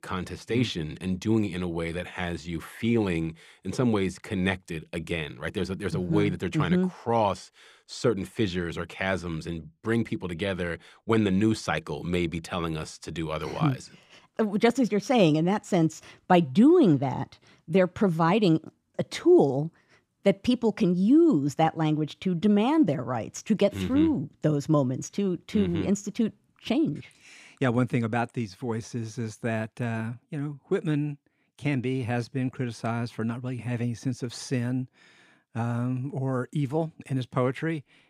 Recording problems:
none

